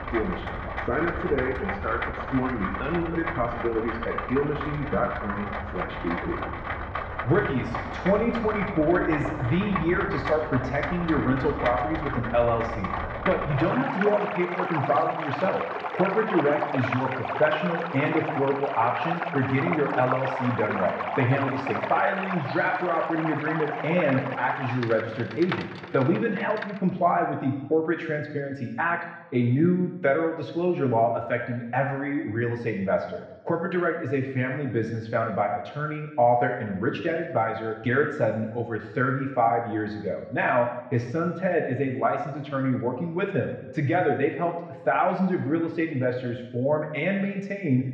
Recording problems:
muffled; very; fading above 2.5 kHz
room echo; noticeable; dies away in 0.9 s
off-mic speech; somewhat distant
rain or running water; loud; until 27 s; 5 dB below the speech

